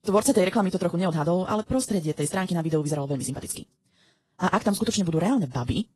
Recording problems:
wrong speed, natural pitch; too fast; 1.6 times normal speed
garbled, watery; slightly; nothing above 11.5 kHz

